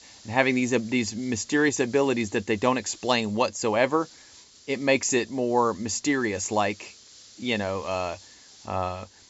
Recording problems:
high frequencies cut off; noticeable; nothing above 8 kHz
hiss; faint; throughout; 25 dB below the speech

